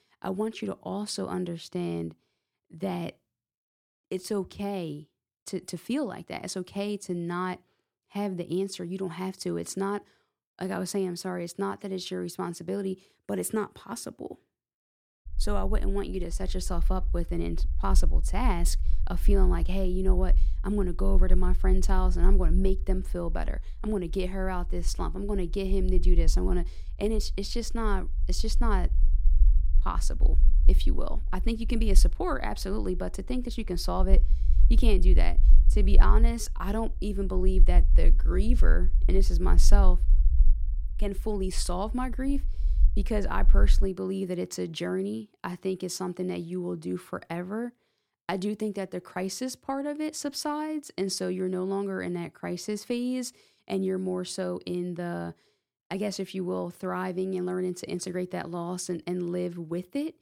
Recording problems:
low rumble; noticeable; from 15 to 44 s; 20 dB below the speech

